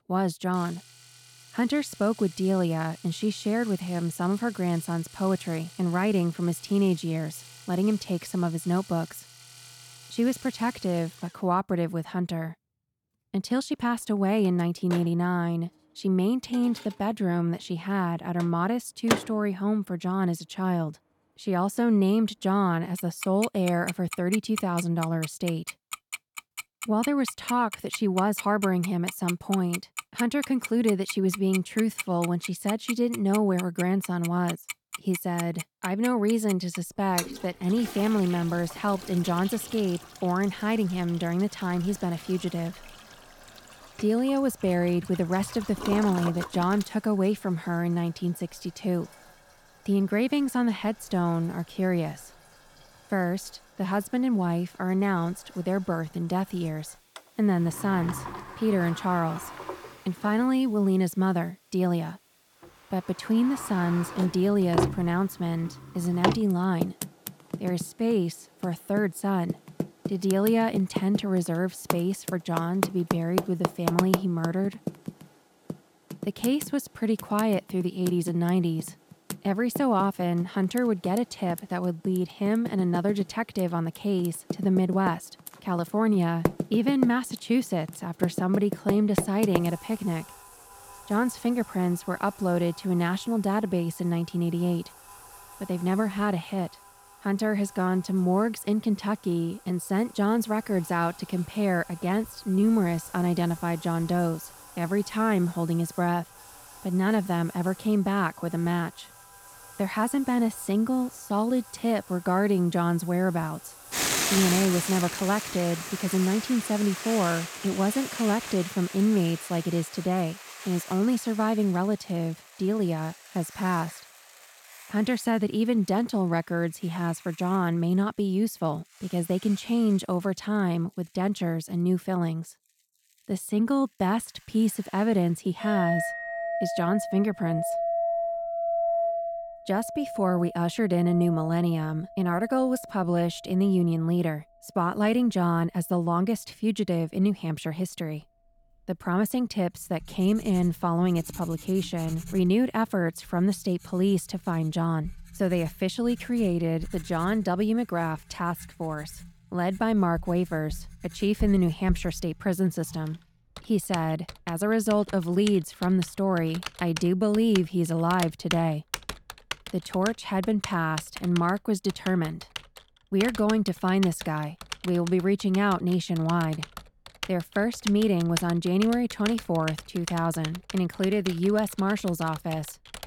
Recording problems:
household noises; loud; throughout; 10 dB below the speech

